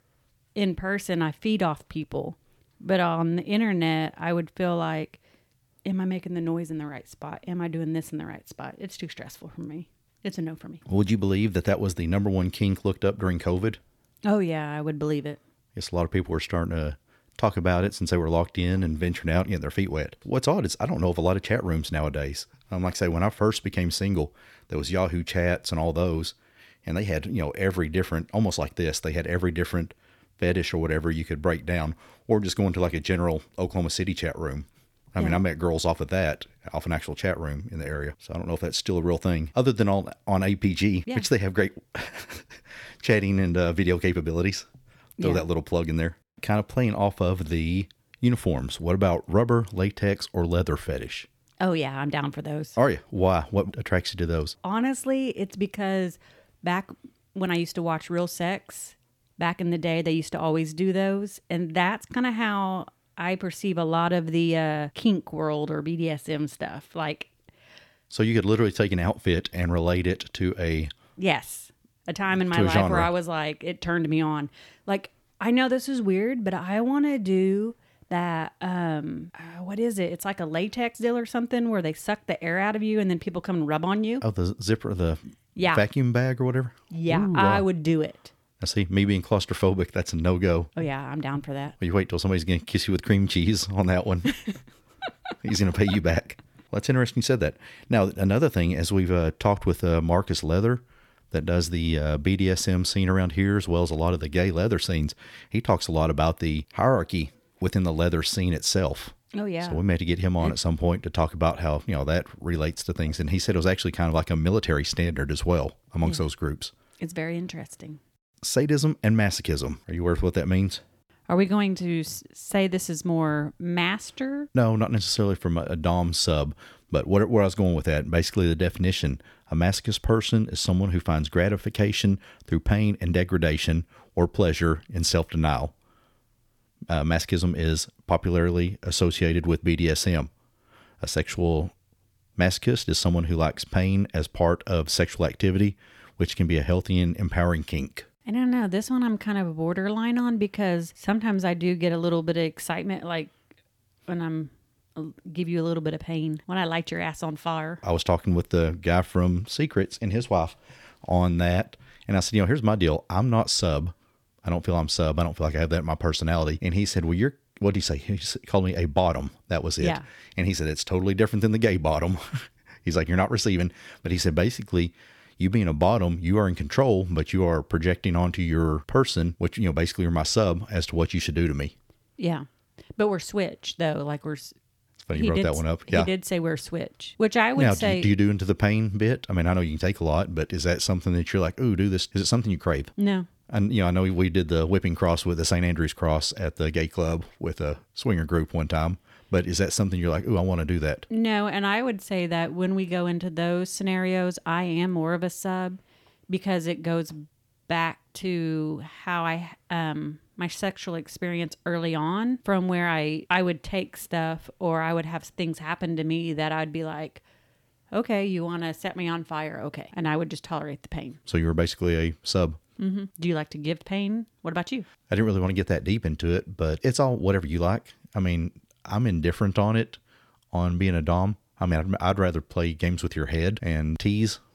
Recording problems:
none

